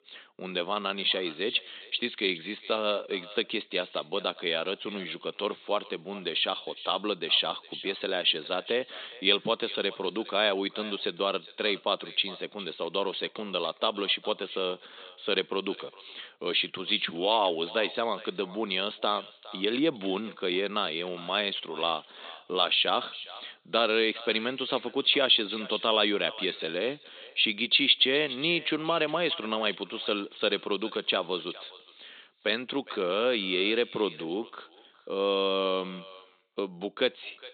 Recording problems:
high frequencies cut off; severe; nothing above 4 kHz
echo of what is said; noticeable; throughout; 410 ms later, 15 dB below the speech
thin; somewhat; fading below 400 Hz

